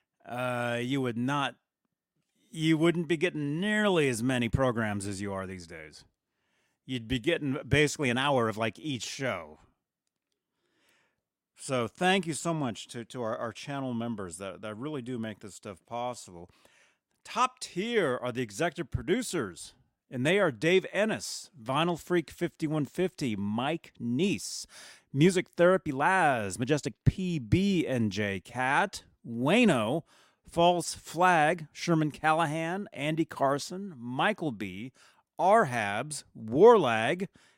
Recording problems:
uneven, jittery; strongly; from 7 to 31 s

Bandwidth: 16 kHz